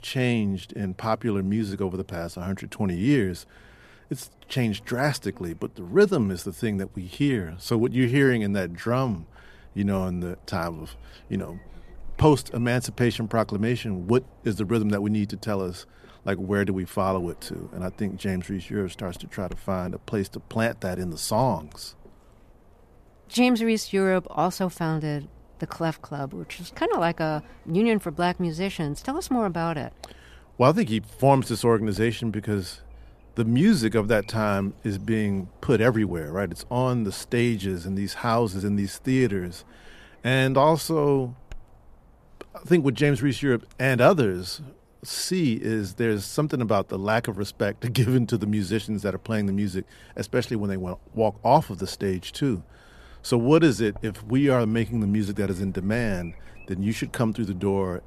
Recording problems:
electrical hum; faint; throughout; 50 Hz, 30 dB below the speech

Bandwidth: 14.5 kHz